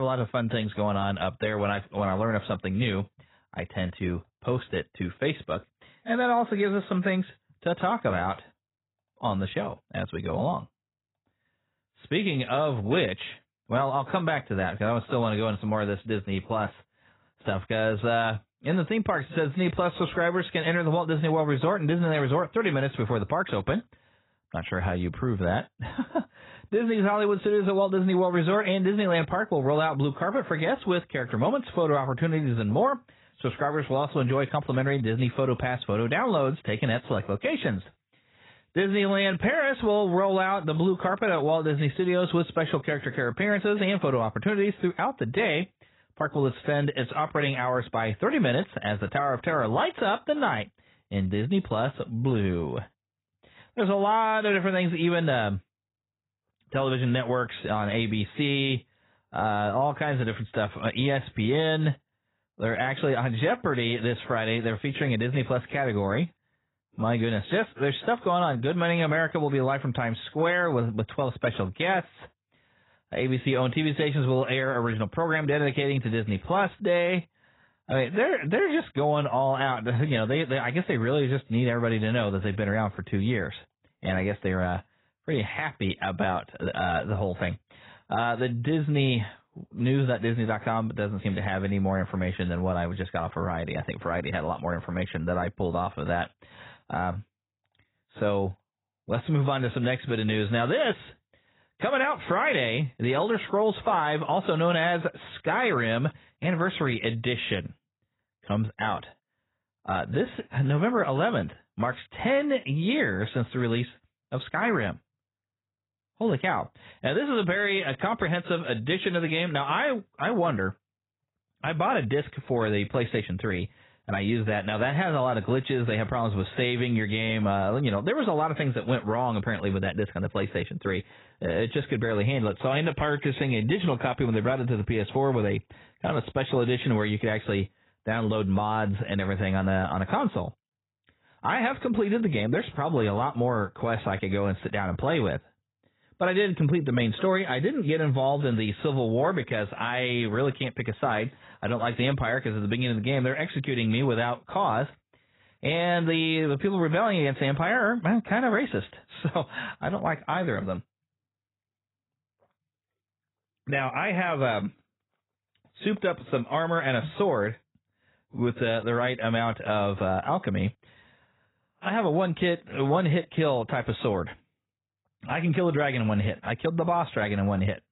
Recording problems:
garbled, watery; badly; nothing above 4 kHz
abrupt cut into speech; at the start

